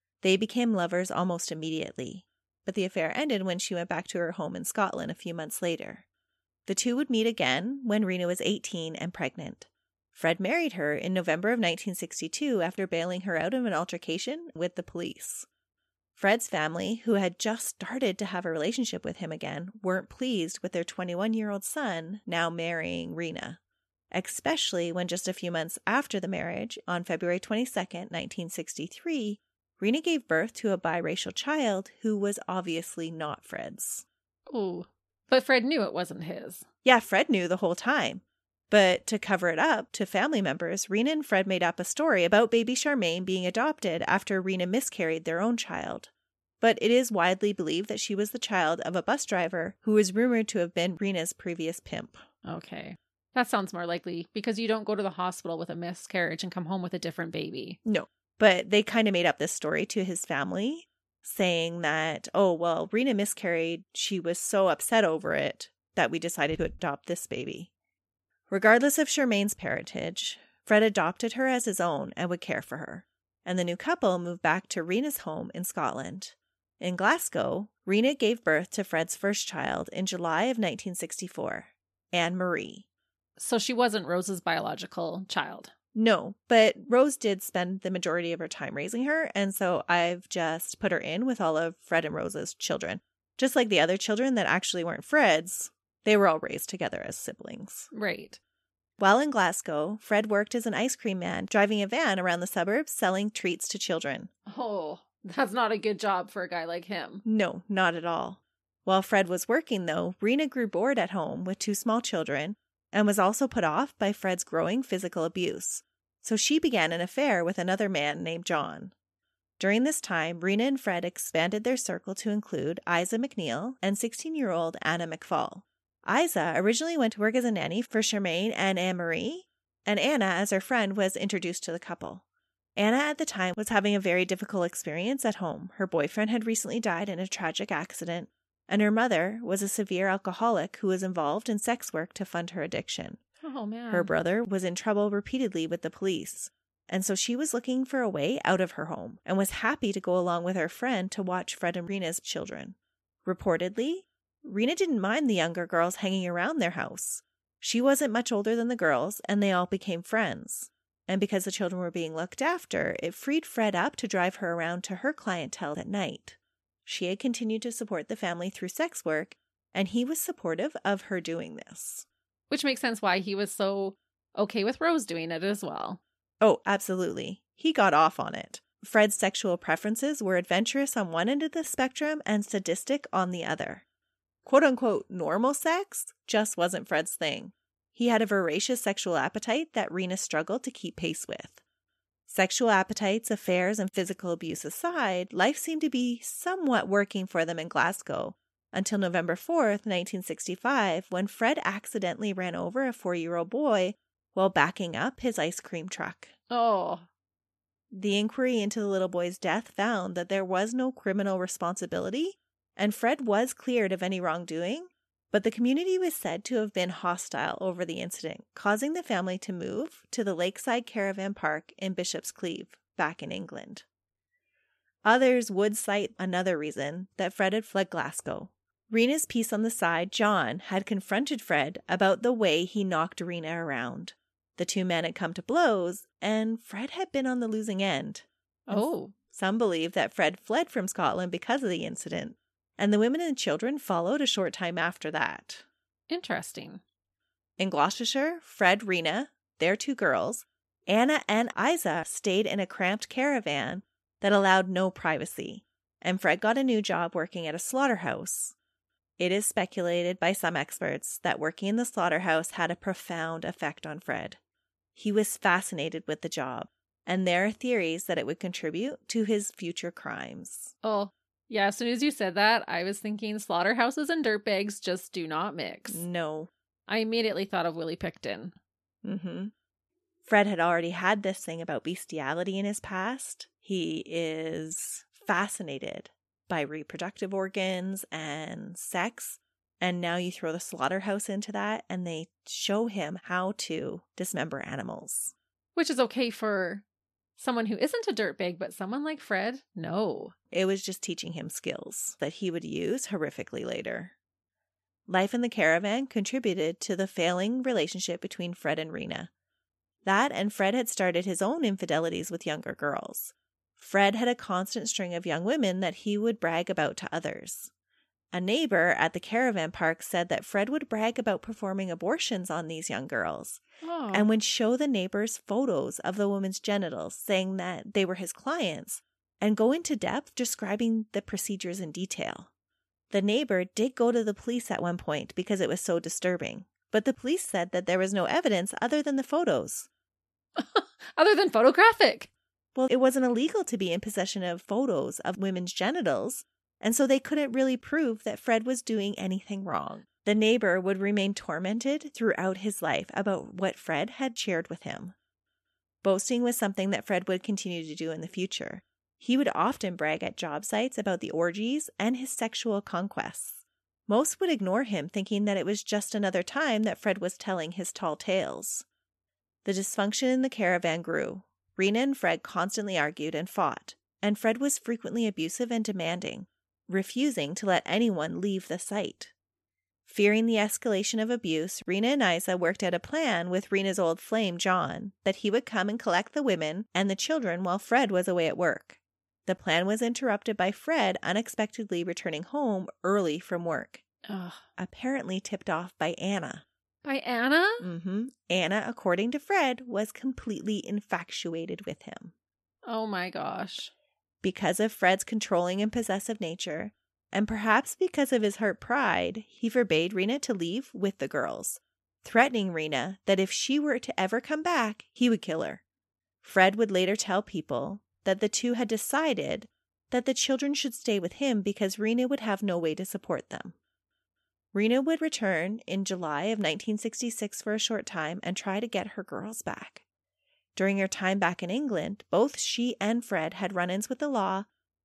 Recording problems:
none

